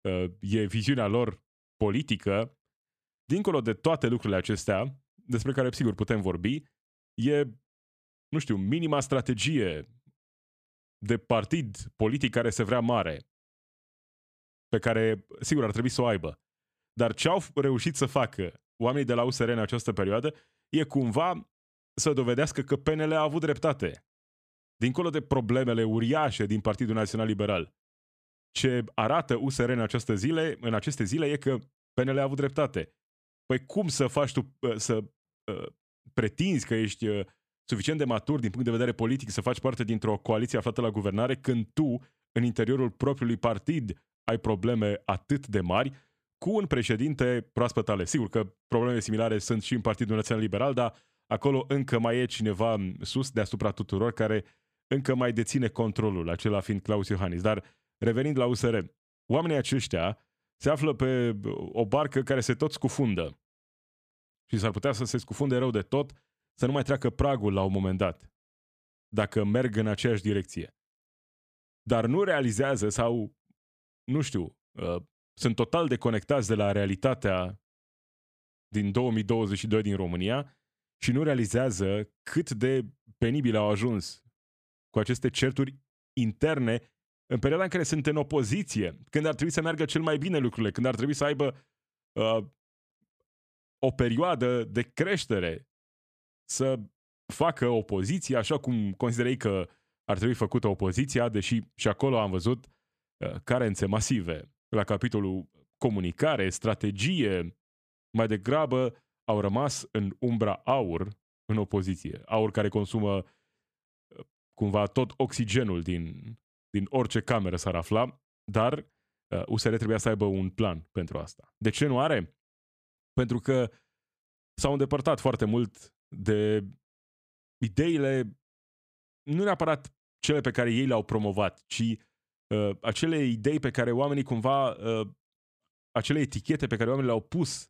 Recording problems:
none

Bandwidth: 14.5 kHz